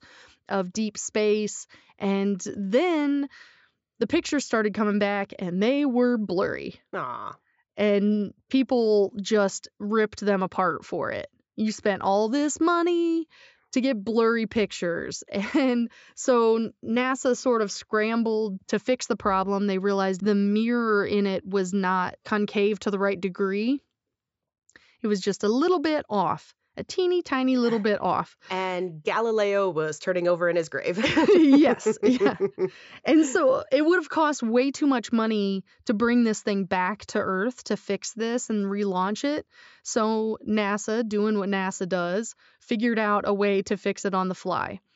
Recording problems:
high frequencies cut off; noticeable; nothing above 8 kHz

